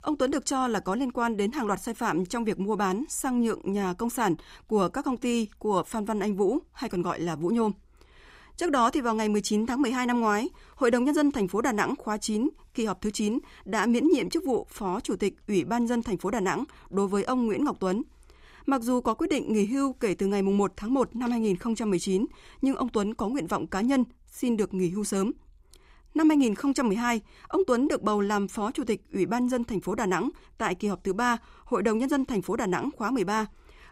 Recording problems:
none

